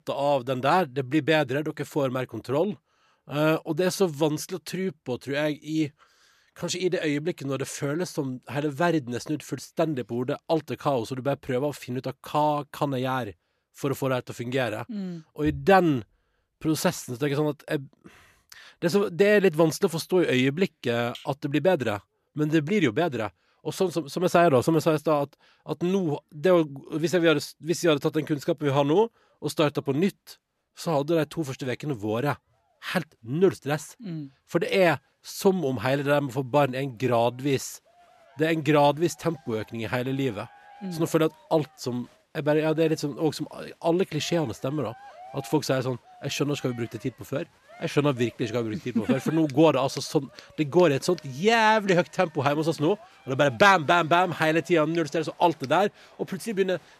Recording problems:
crowd noise; faint; throughout; 25 dB below the speech

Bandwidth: 14 kHz